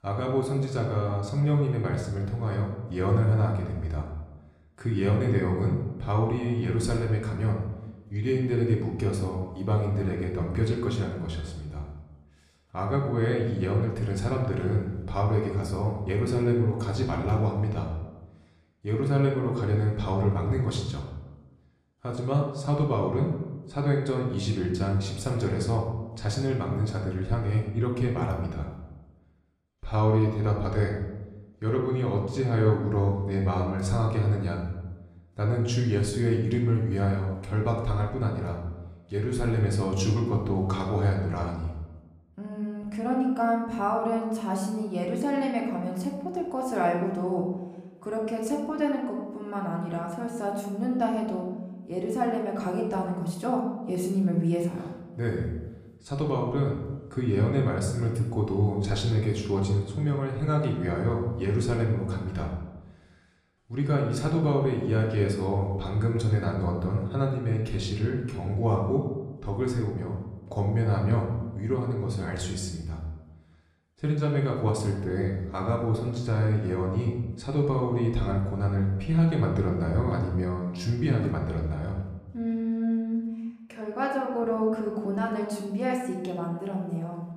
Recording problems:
room echo; noticeable; dies away in 0.9 s
off-mic speech; somewhat distant

